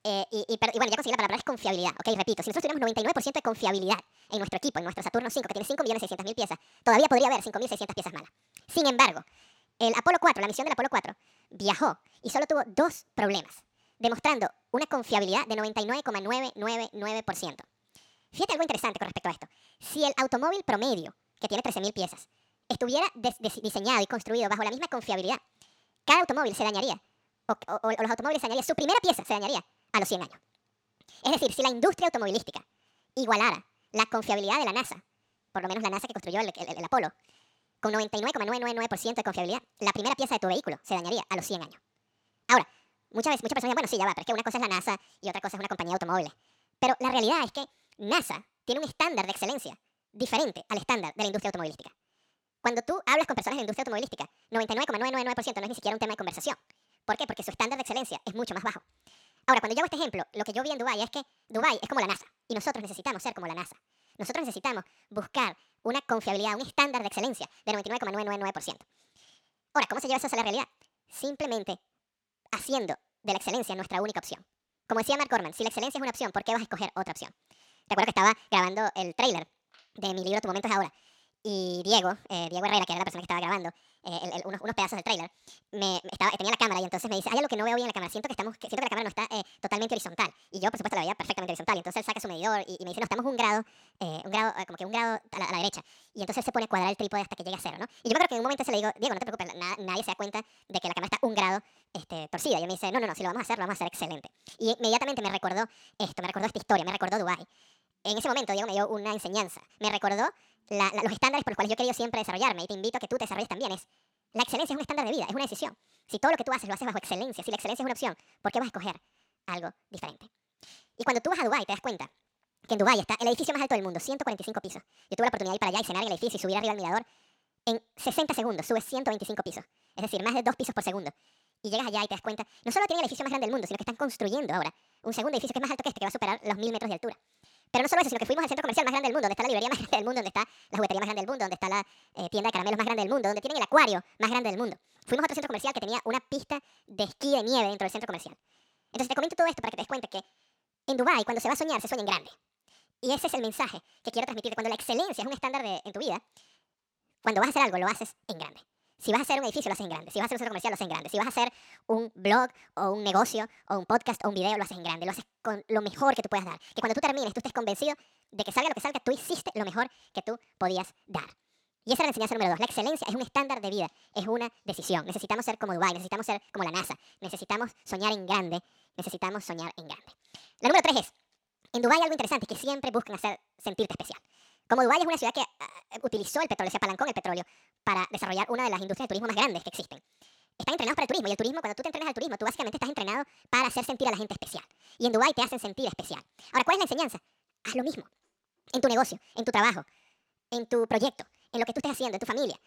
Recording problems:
wrong speed and pitch; too fast and too high; 1.7 times normal speed

